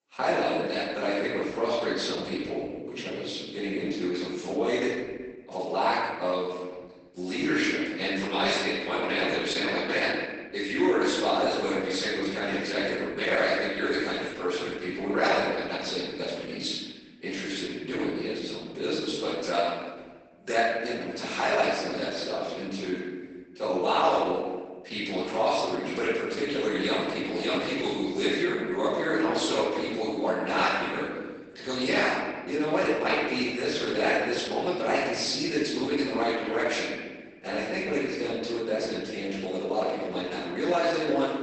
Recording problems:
room echo; strong; dies away in 1.4 s
off-mic speech; far
garbled, watery; badly; nothing above 8 kHz
thin; somewhat; fading below 250 Hz

